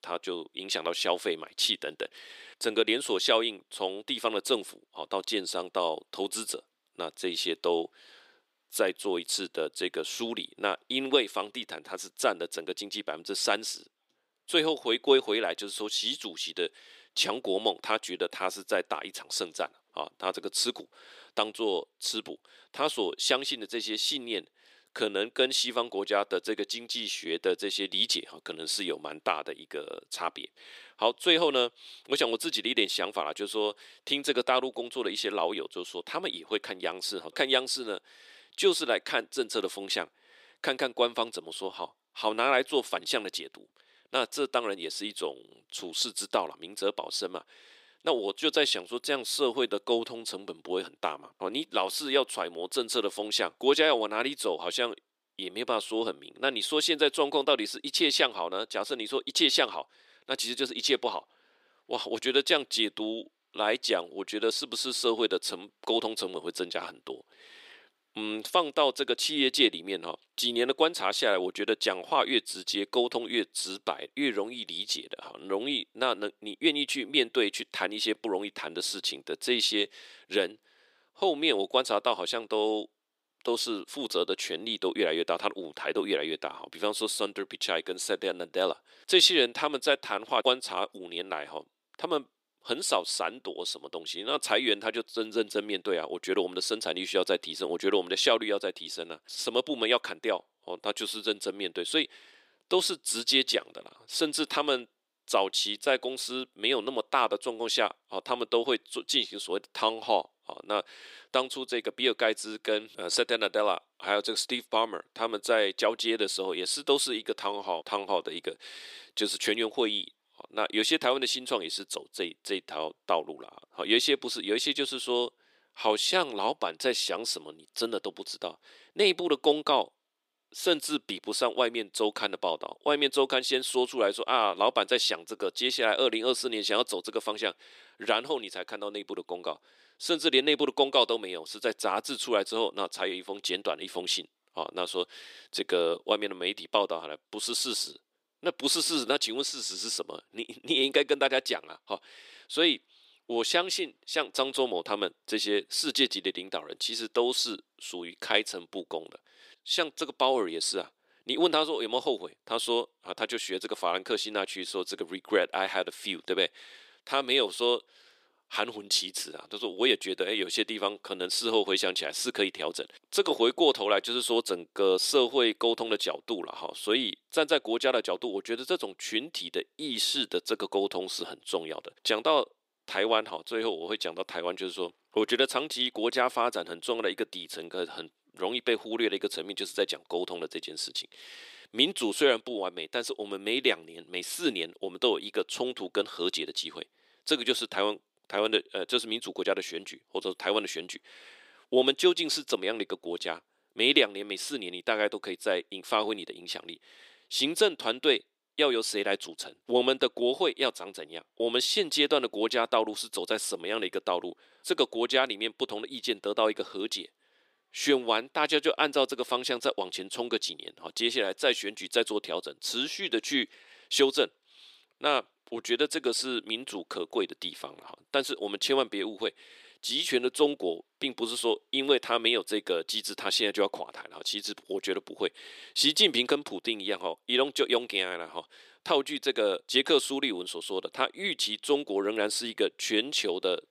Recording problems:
thin; somewhat; fading below 300 Hz

